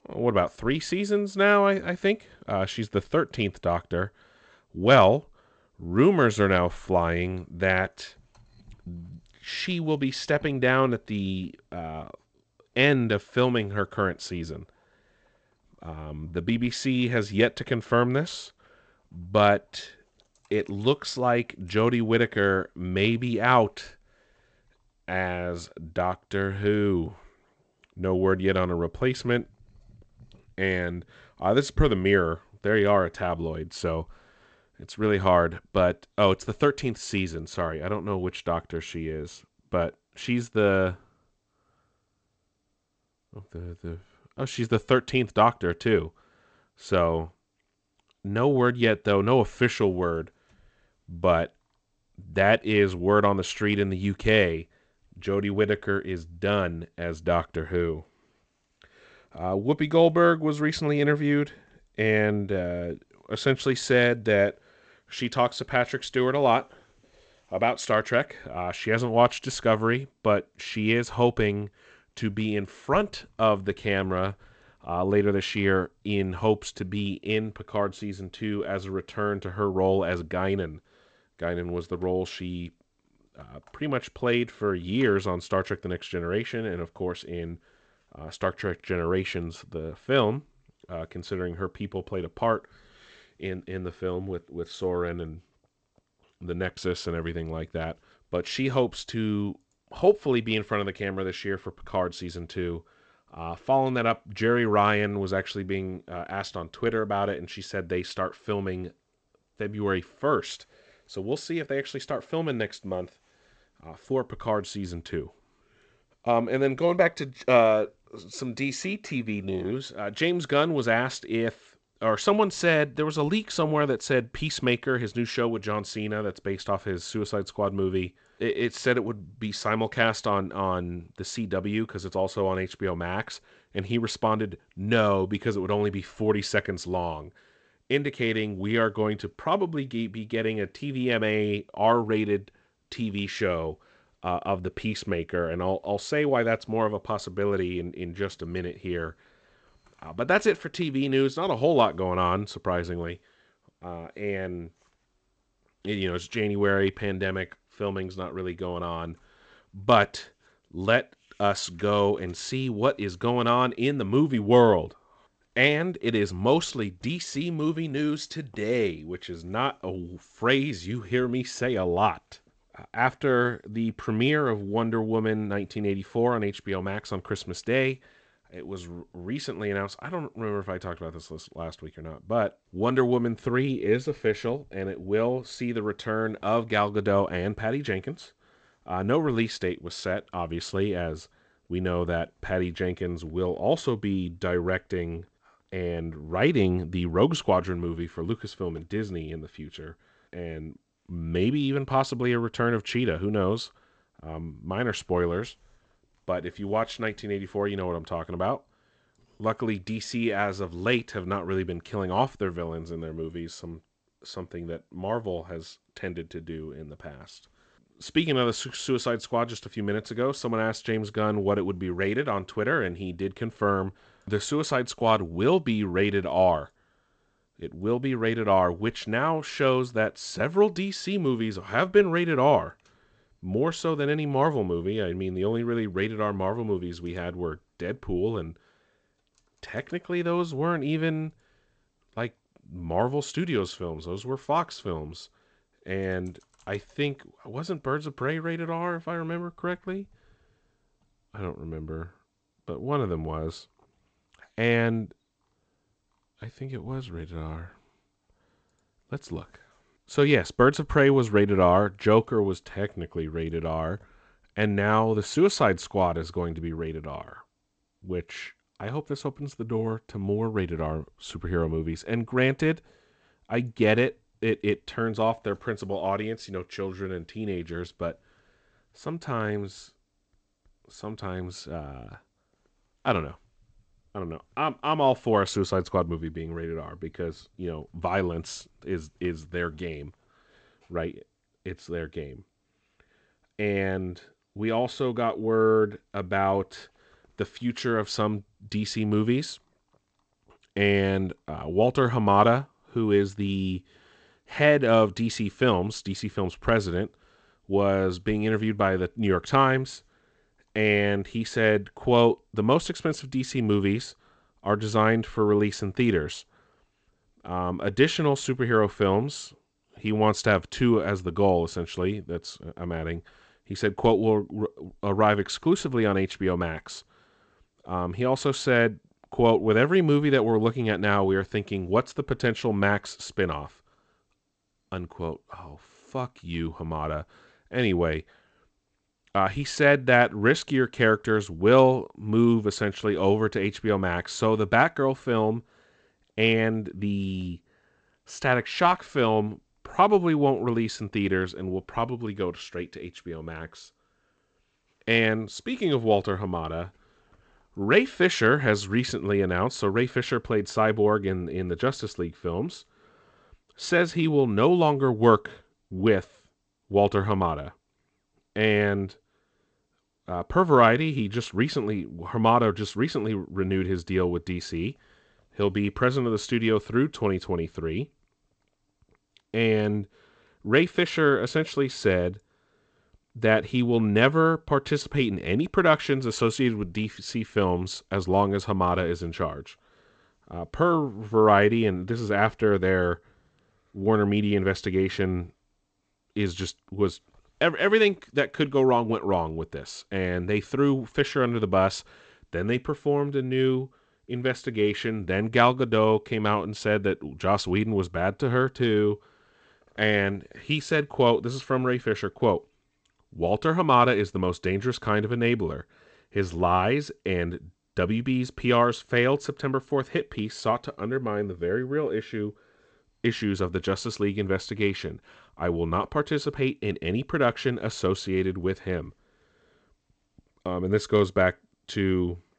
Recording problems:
garbled, watery; slightly; nothing above 8 kHz

